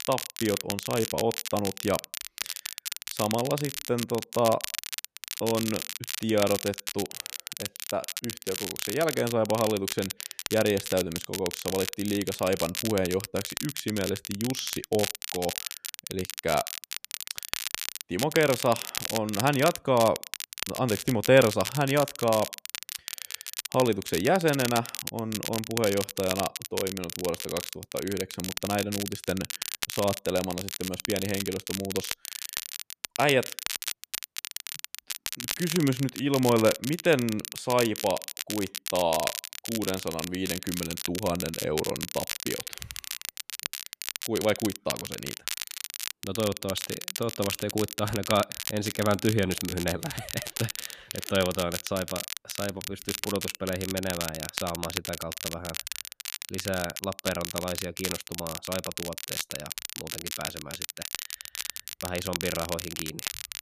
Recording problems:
crackle, like an old record; loud; 5 dB below the speech

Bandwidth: 14.5 kHz